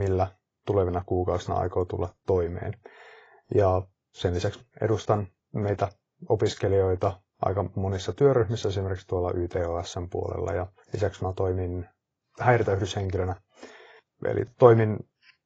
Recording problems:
garbled, watery; badly; nothing above 7.5 kHz
abrupt cut into speech; at the start

